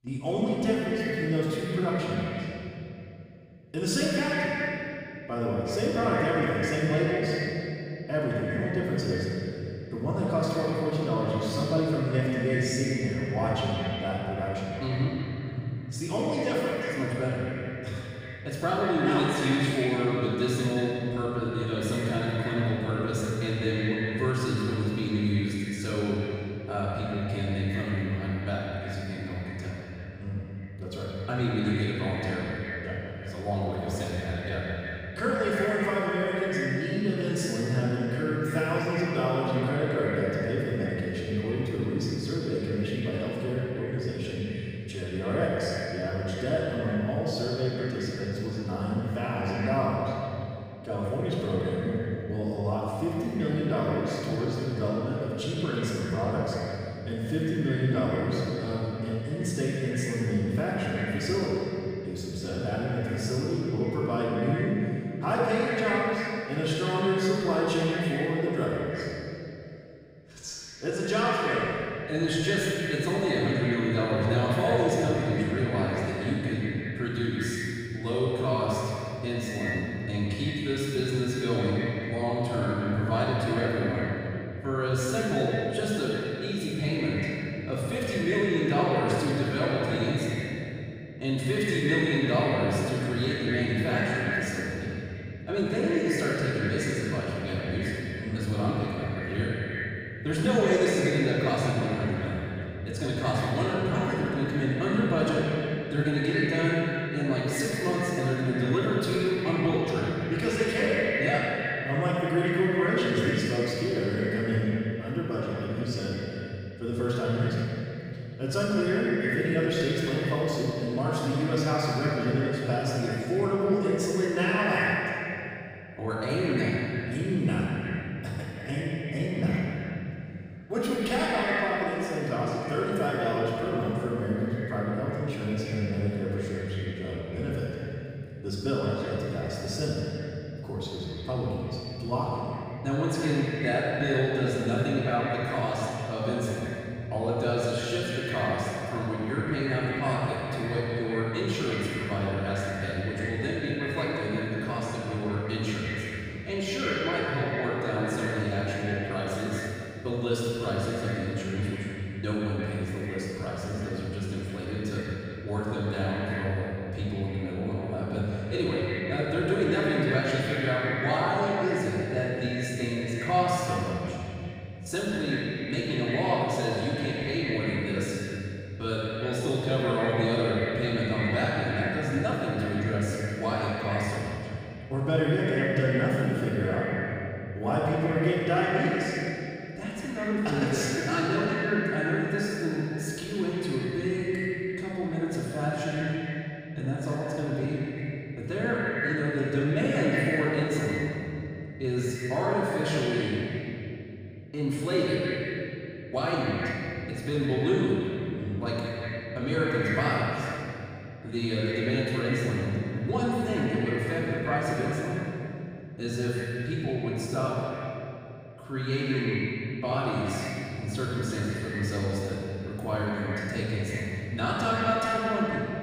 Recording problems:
echo of what is said; strong; throughout; 170 ms later, 8 dB below the speech
room echo; strong; dies away in 2.5 s
off-mic speech; far

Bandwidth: 15.5 kHz